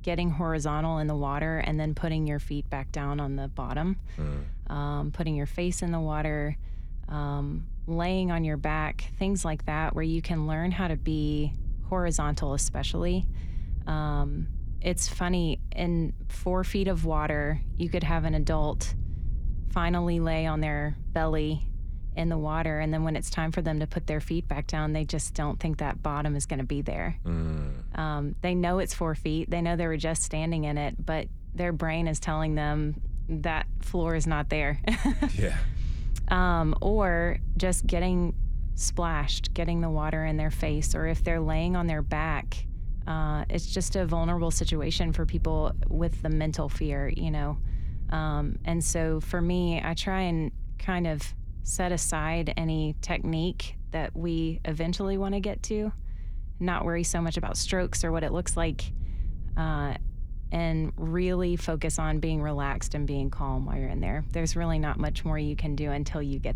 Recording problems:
low rumble; faint; throughout; 25 dB below the speech

